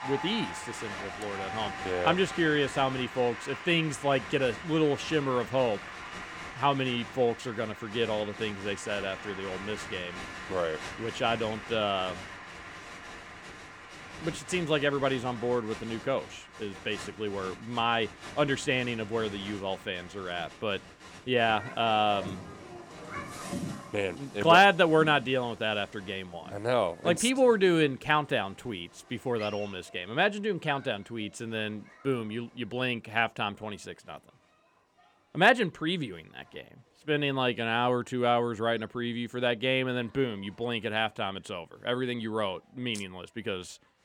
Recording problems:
crowd noise; noticeable; throughout; 15 dB below the speech

